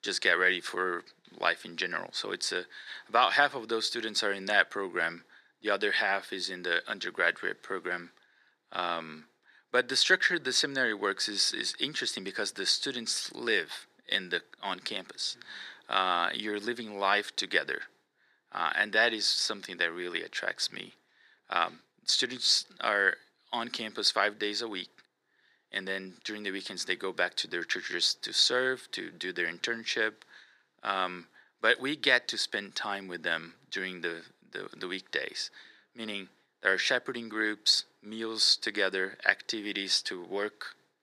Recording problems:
thin; very; fading below 300 Hz

